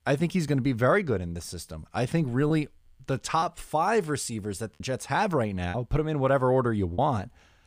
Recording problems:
choppy; occasionally; 3% of the speech affected

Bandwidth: 15 kHz